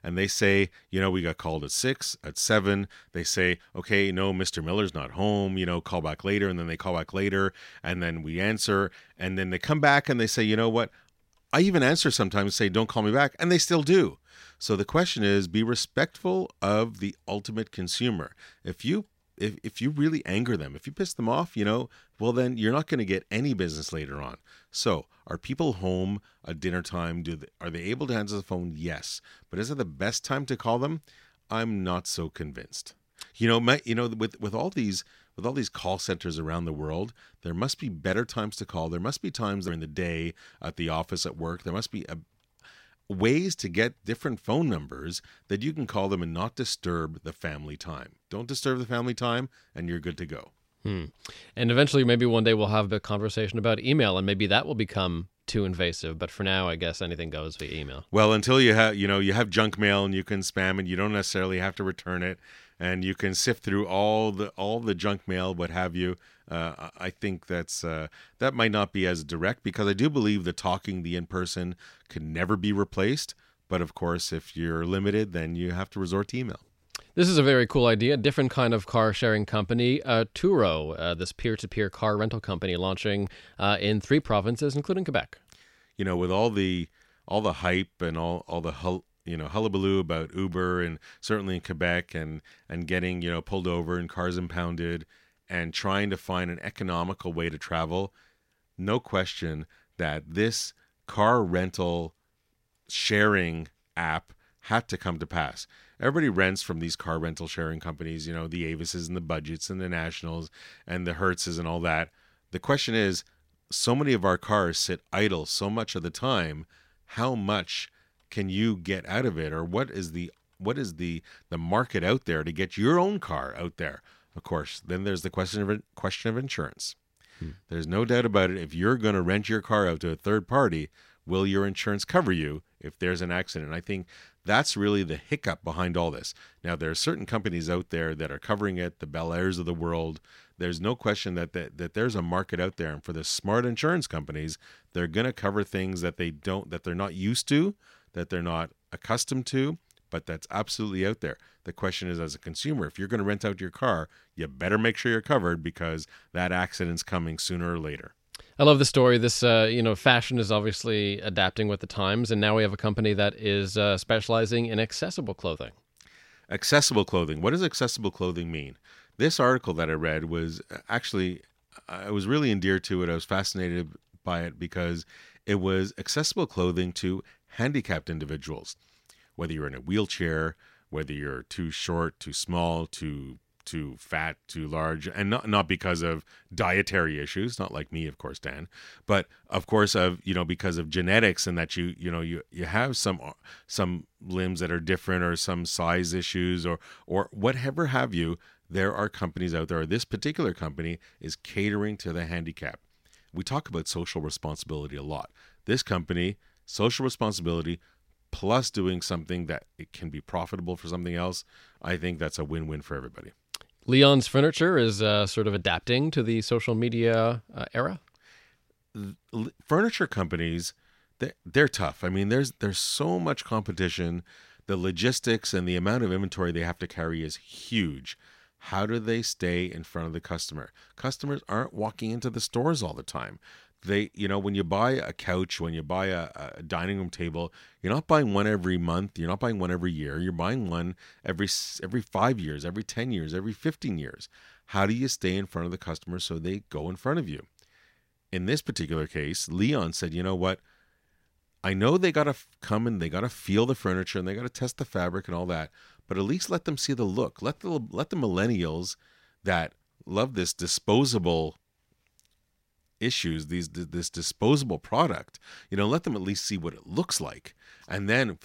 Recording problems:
none

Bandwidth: 16 kHz